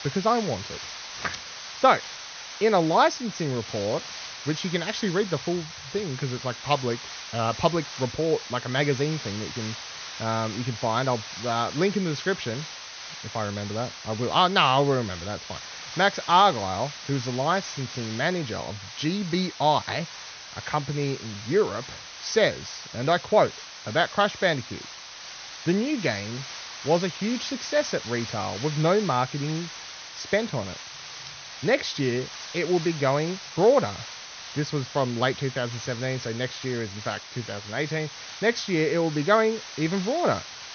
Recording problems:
high frequencies cut off; noticeable; nothing above 6.5 kHz
hiss; noticeable; throughout; 10 dB below the speech

